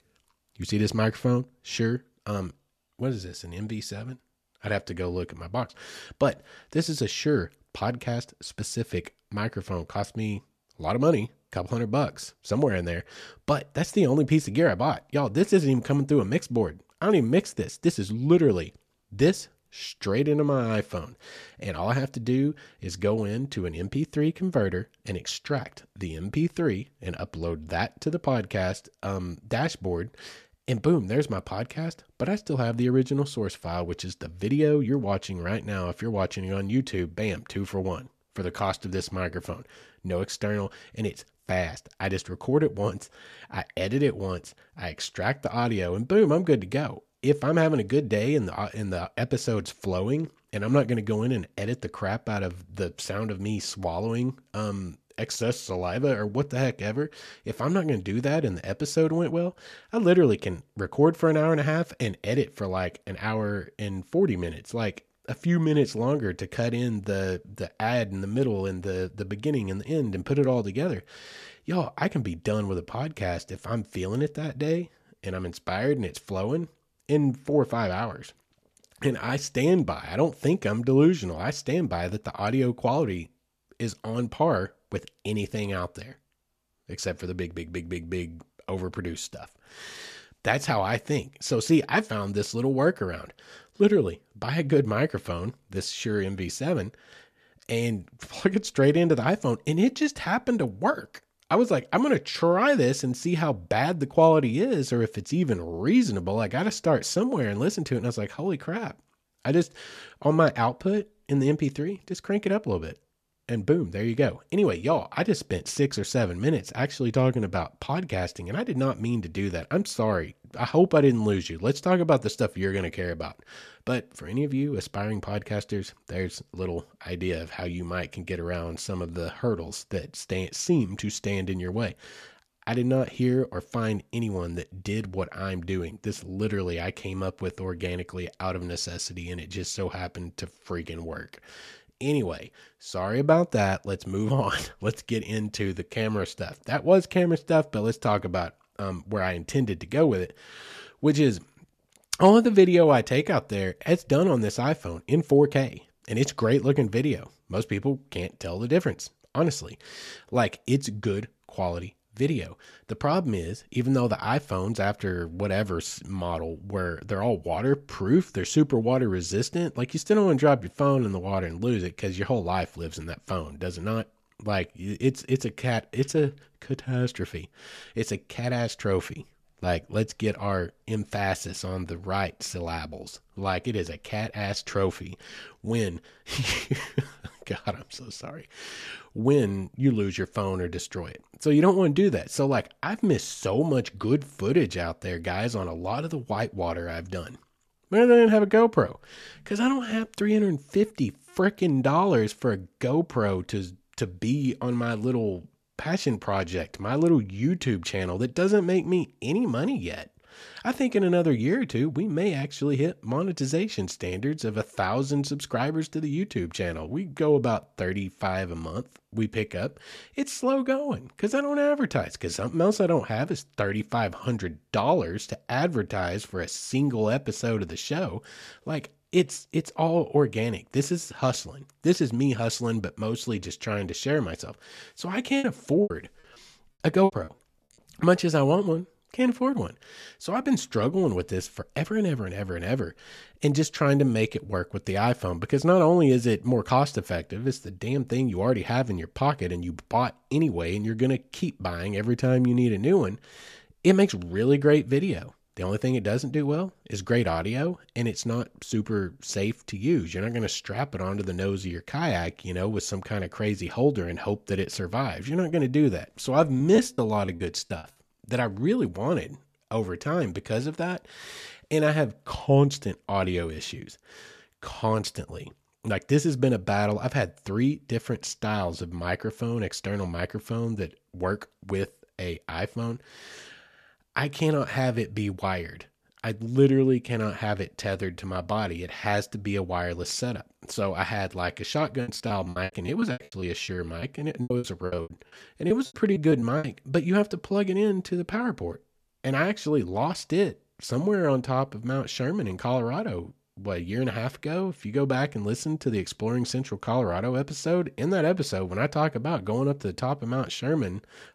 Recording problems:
choppy; very; from 3:55 to 3:57, from 4:27 to 4:28 and from 4:52 to 4:57; 24% of the speech affected

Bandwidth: 14 kHz